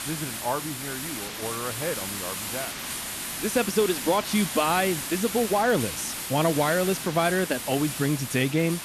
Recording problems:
hiss; loud; throughout; 5 dB below the speech

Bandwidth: 13.5 kHz